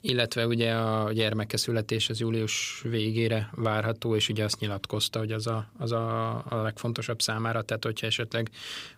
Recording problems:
none

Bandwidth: 15.5 kHz